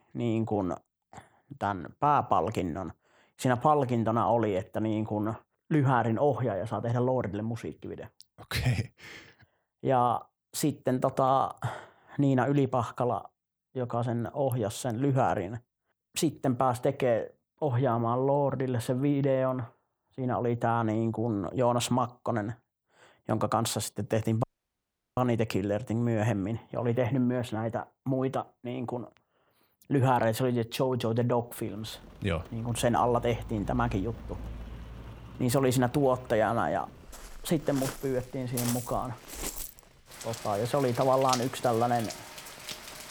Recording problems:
rain or running water; noticeable; from 32 s on; 10 dB below the speech
audio cutting out; at 24 s for 0.5 s

